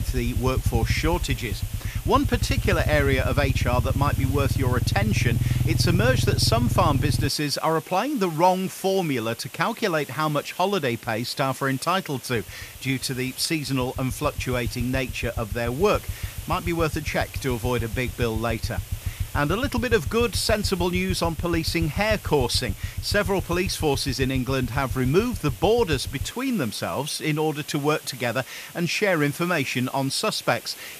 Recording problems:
hiss; noticeable; throughout; 15 dB below the speech
low rumble; noticeable; until 7.5 s and from 12 to 26 s; 15 dB below the speech

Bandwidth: 14.5 kHz